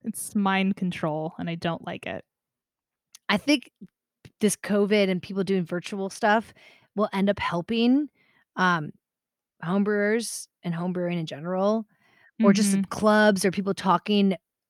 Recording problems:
none

